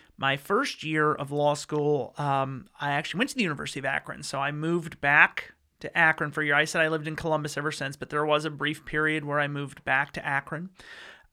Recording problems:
none

